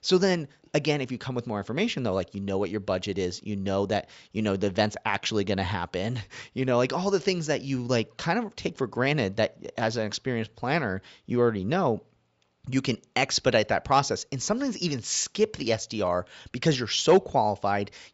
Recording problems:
high frequencies cut off; noticeable; nothing above 8 kHz

